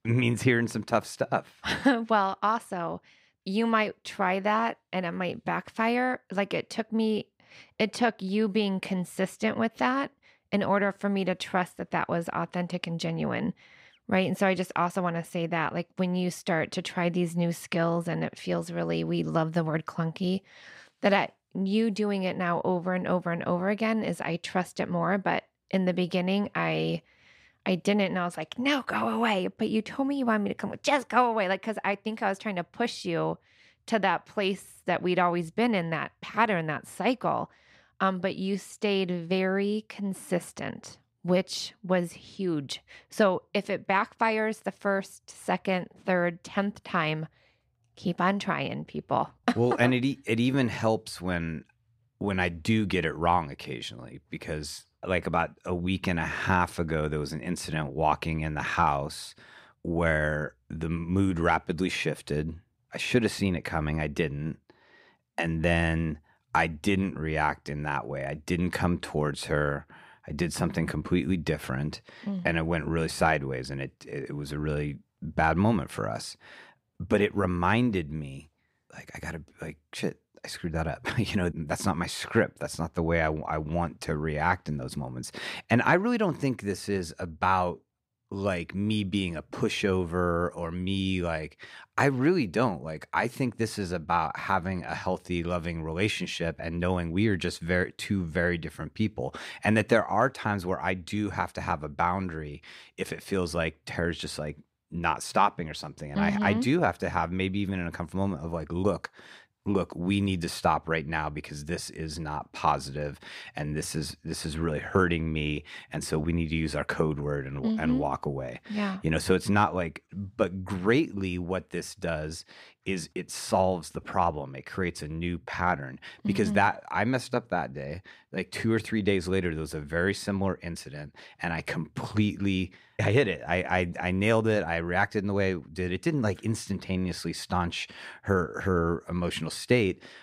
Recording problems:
none

